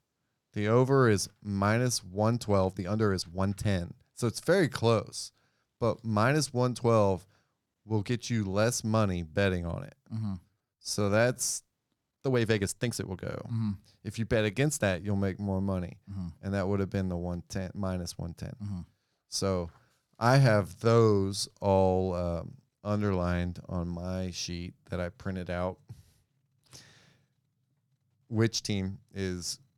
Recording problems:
uneven, jittery; strongly; from 2.5 to 29 s

